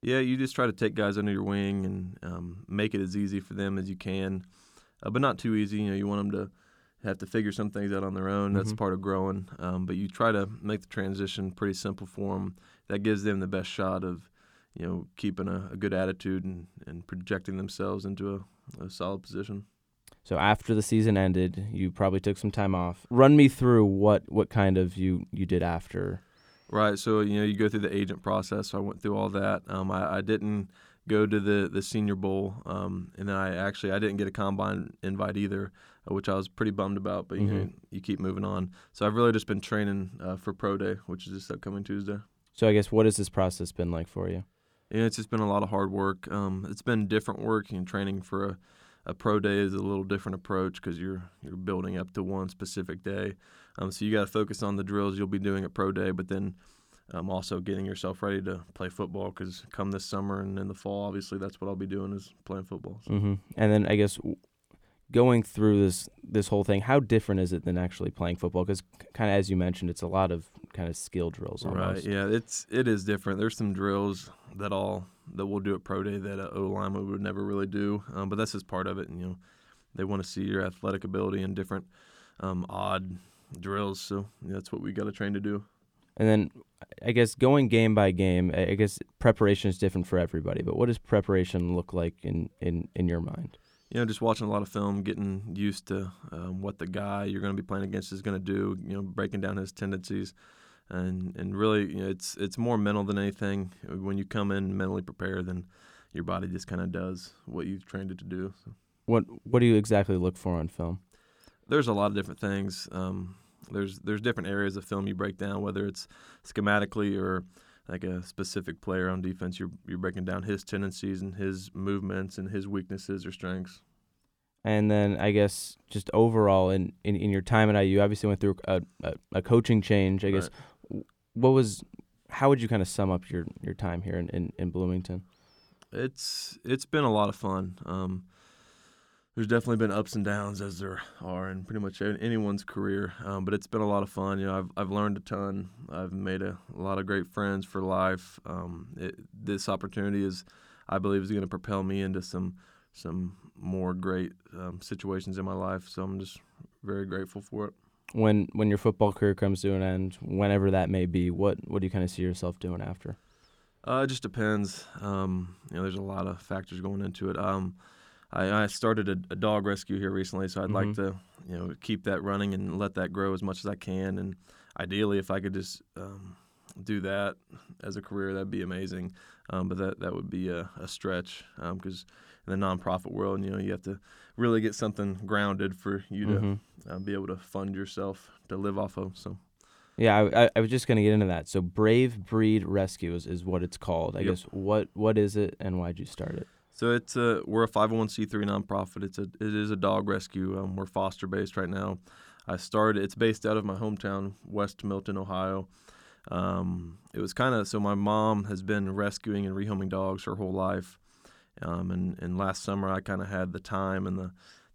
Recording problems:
none

